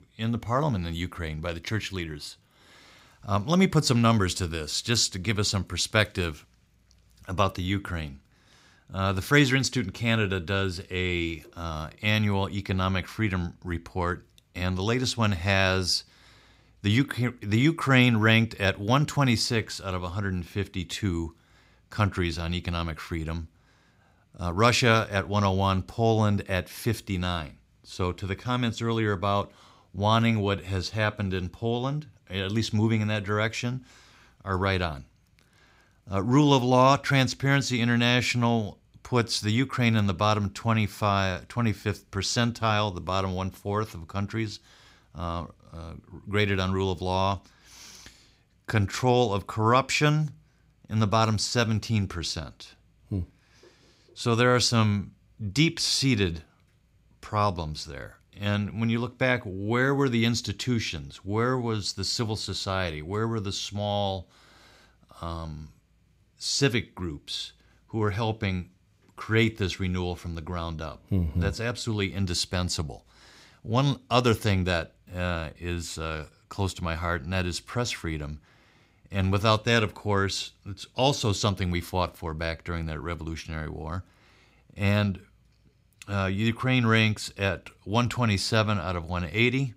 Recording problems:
none

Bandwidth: 15.5 kHz